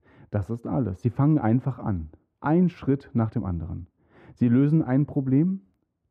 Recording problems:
muffled; very; fading above 2.5 kHz

